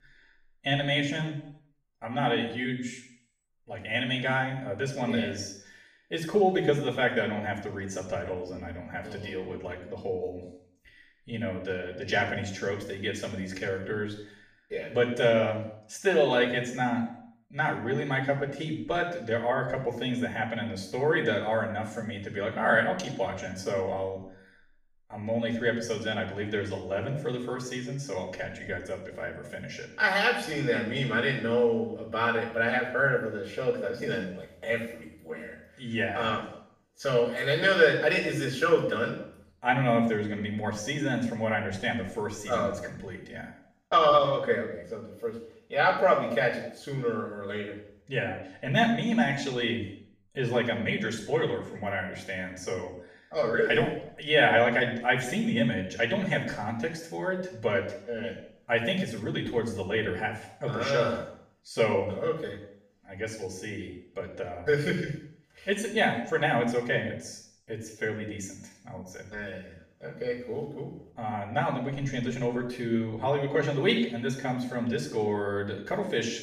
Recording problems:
off-mic speech; far
room echo; noticeable; dies away in 0.6 s

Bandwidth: 15 kHz